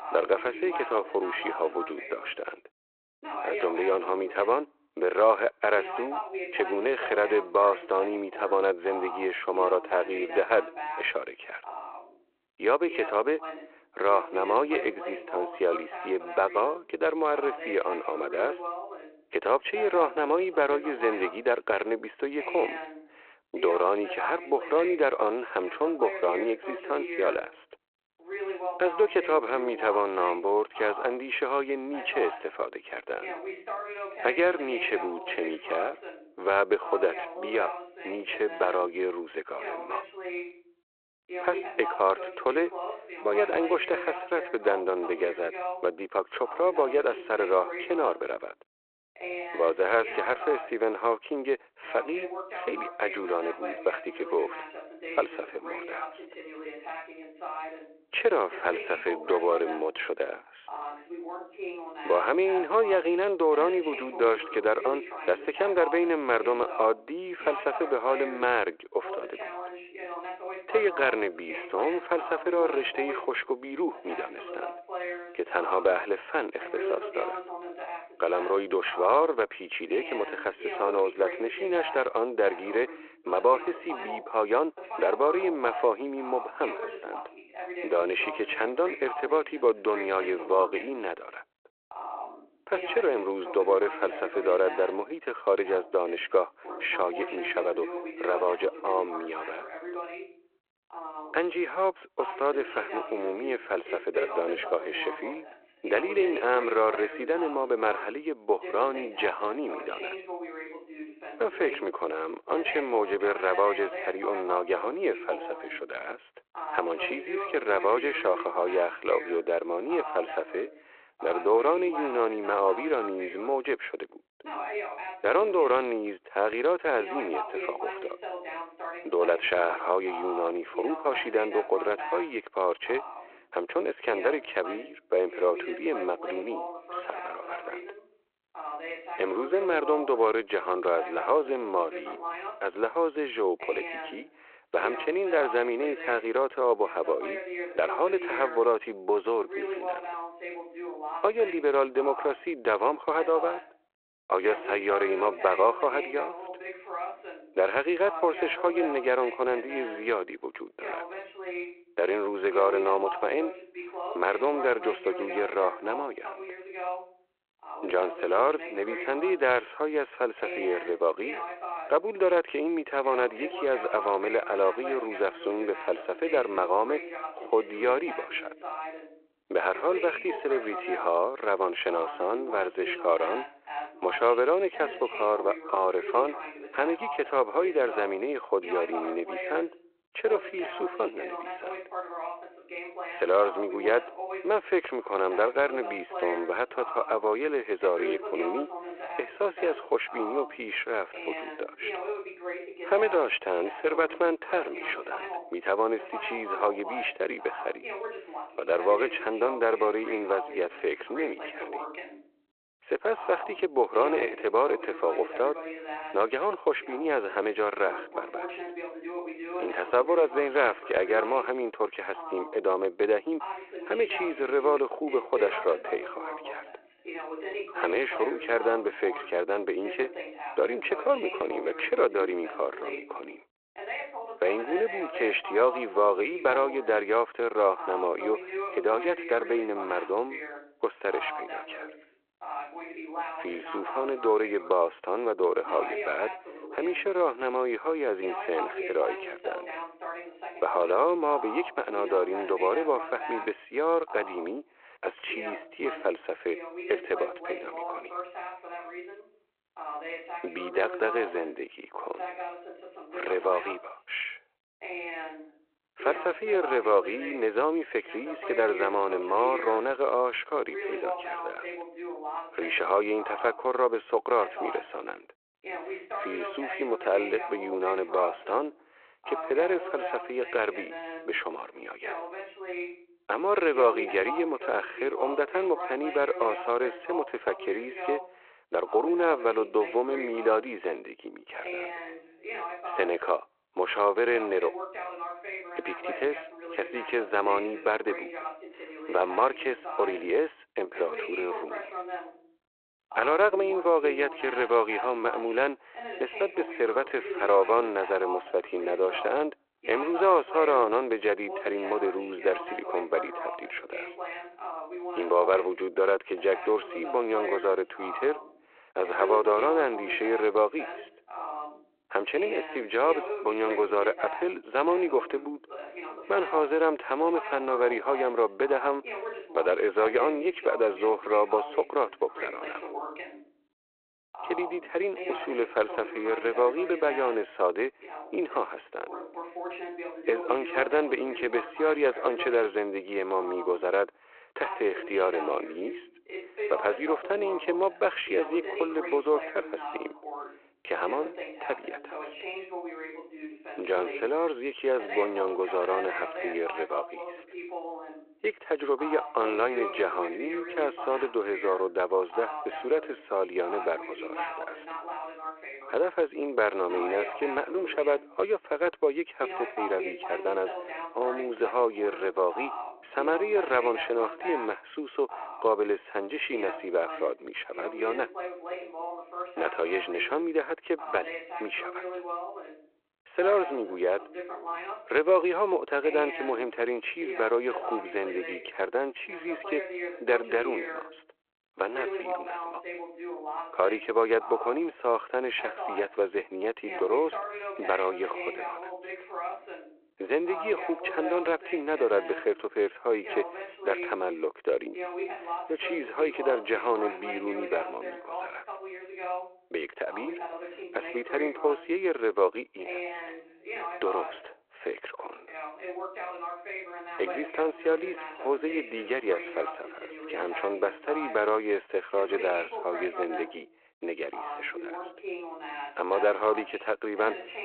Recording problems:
phone-call audio
voice in the background; loud; throughout; 10 dB below the speech

